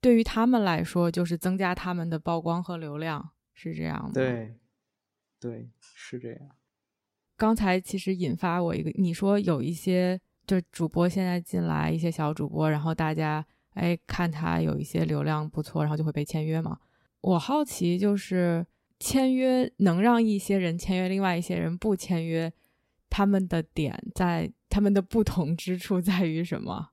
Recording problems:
uneven, jittery; strongly; from 3.5 to 17 s

